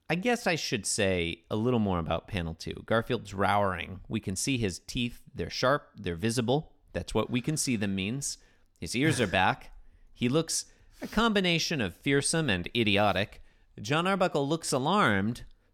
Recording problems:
none

